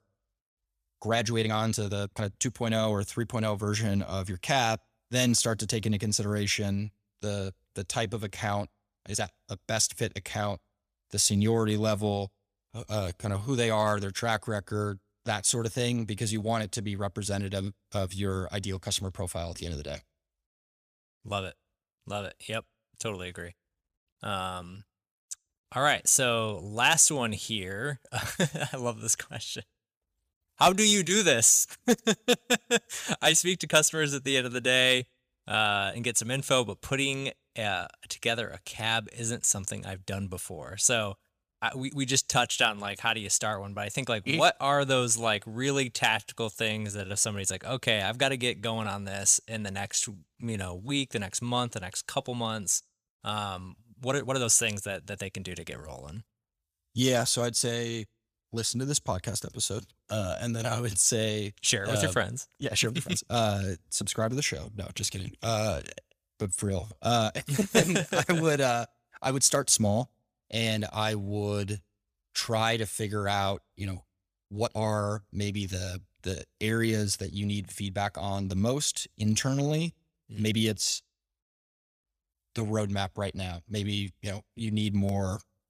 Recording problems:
uneven, jittery; strongly; from 1 s to 1:21

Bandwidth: 15 kHz